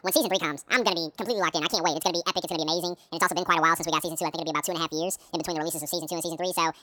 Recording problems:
wrong speed and pitch; too fast and too high; 1.7 times normal speed

